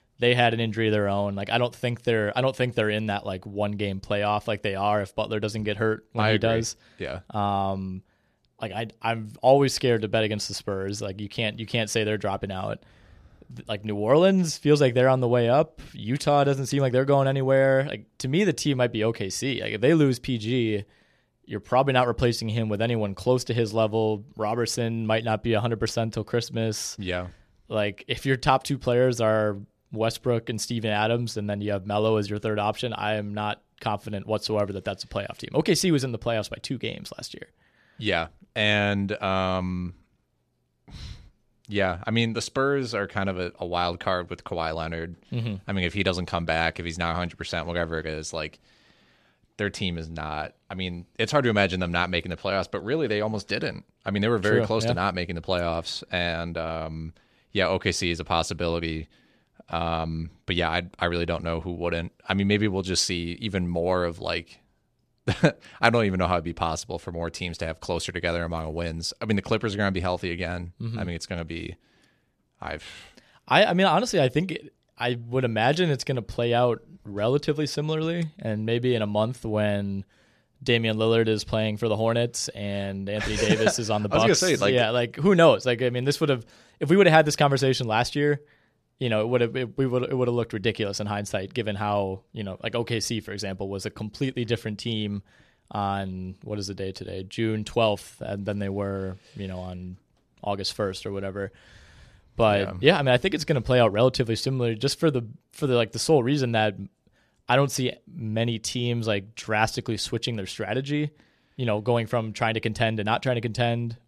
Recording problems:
none

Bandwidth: 14 kHz